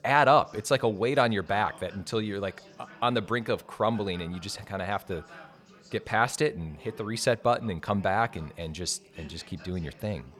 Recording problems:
background chatter; faint; throughout; 3 voices, 25 dB below the speech

